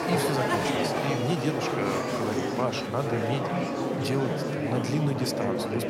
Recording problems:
murmuring crowd; very loud; throughout; 3 dB above the speech

